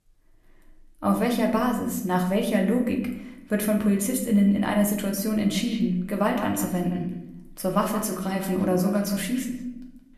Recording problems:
echo of what is said; noticeable; from 5.5 s on; 170 ms later, 15 dB below the speech
room echo; slight; dies away in 0.6 s
off-mic speech; somewhat distant

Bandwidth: 13.5 kHz